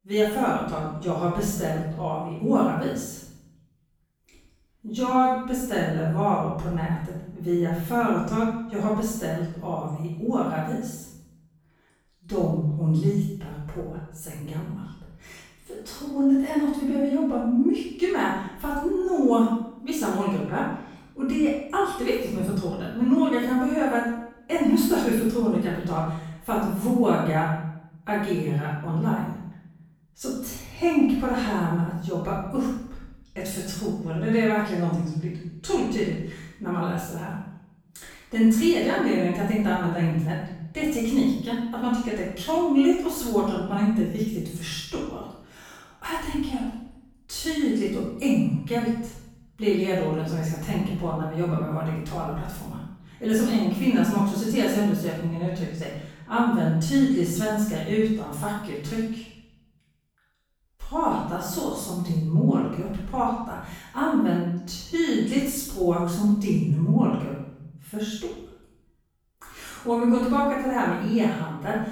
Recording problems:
room echo; strong; dies away in 0.7 s
off-mic speech; far

